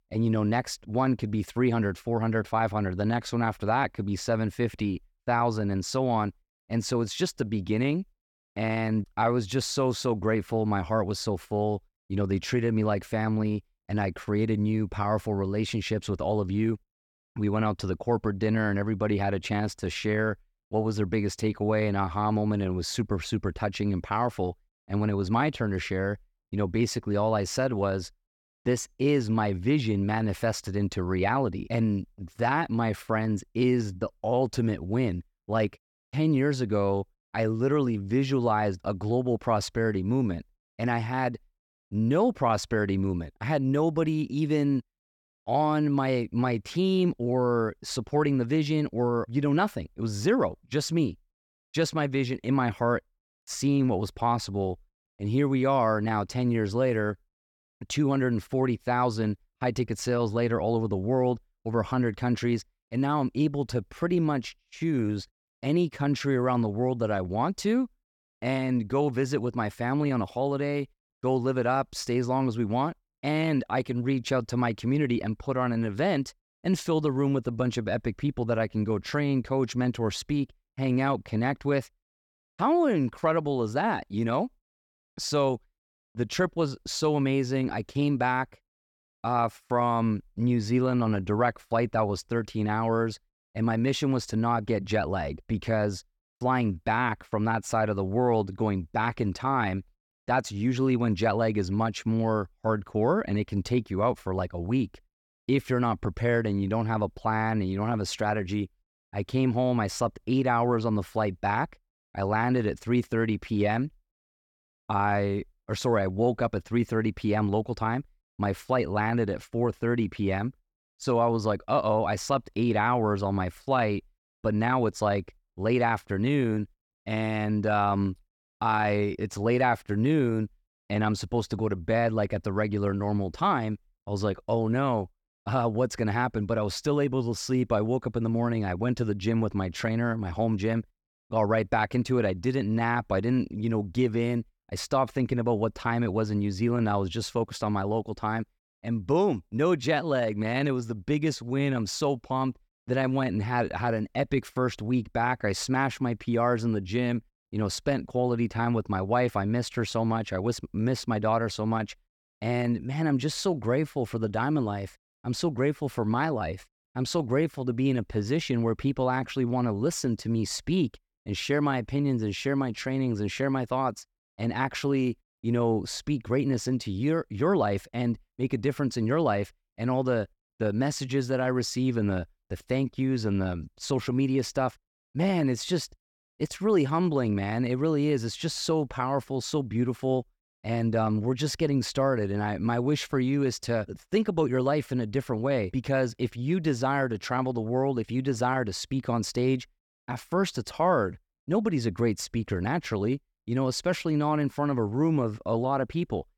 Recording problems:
none

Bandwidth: 18 kHz